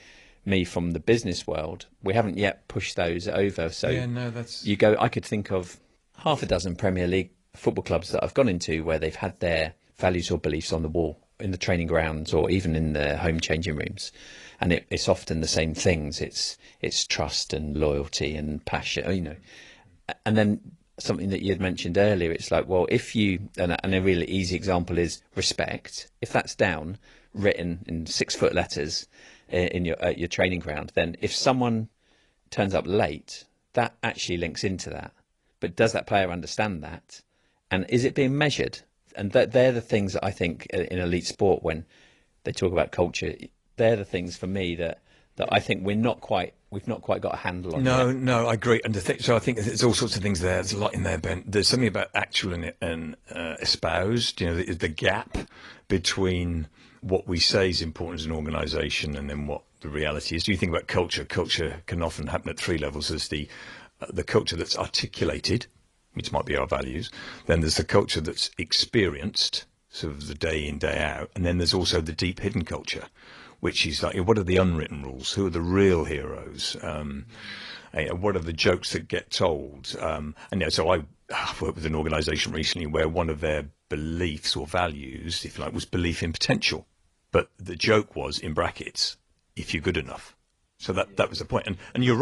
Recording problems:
garbled, watery; slightly; nothing above 10.5 kHz
abrupt cut into speech; at the end

